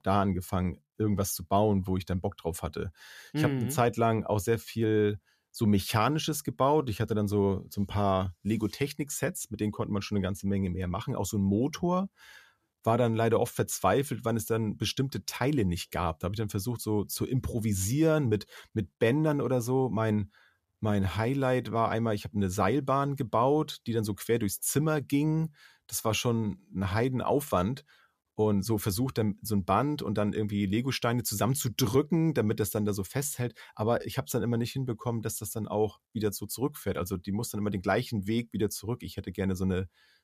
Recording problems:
none

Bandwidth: 14.5 kHz